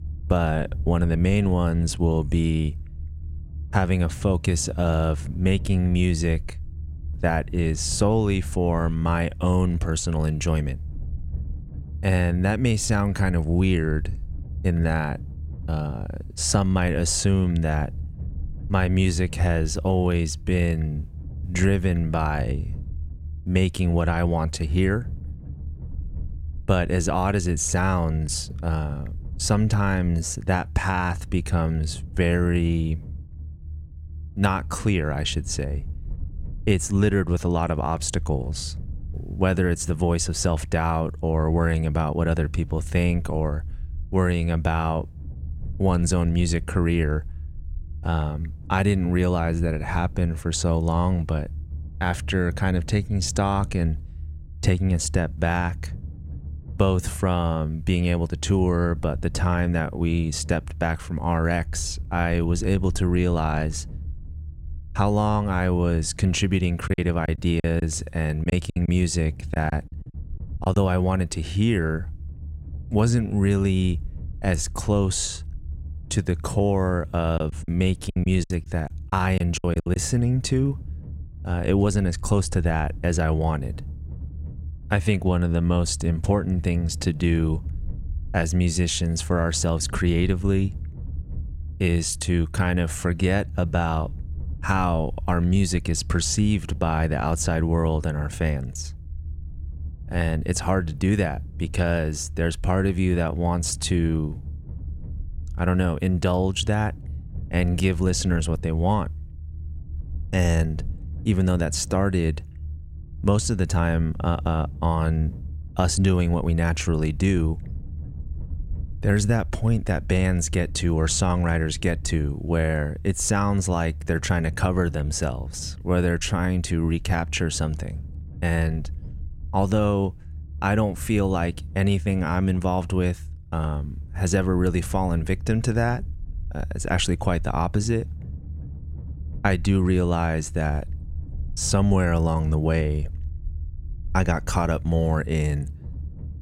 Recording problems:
low rumble; faint; throughout; 25 dB below the speech
choppy; very; from 1:07 to 1:11 and from 1:17 to 1:20; 13% of the speech affected

